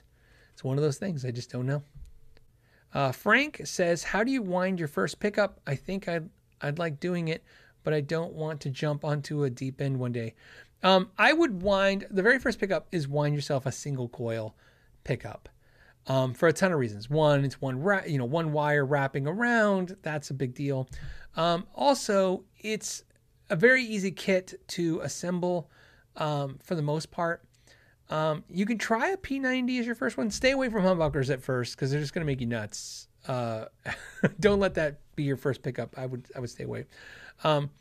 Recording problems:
none

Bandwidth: 14.5 kHz